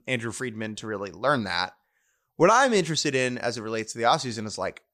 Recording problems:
none

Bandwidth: 15 kHz